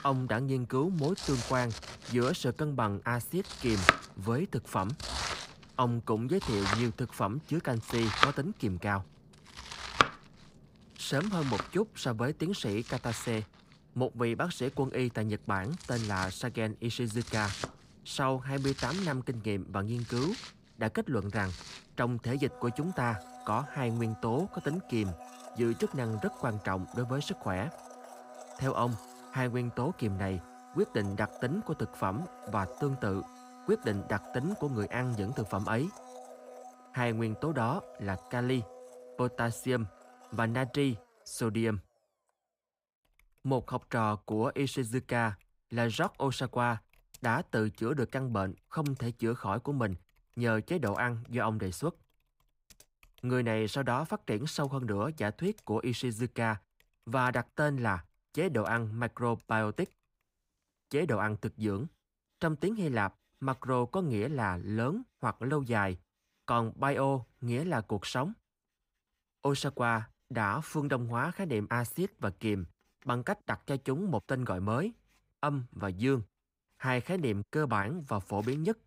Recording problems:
household noises; loud; throughout; 7 dB below the speech

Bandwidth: 15.5 kHz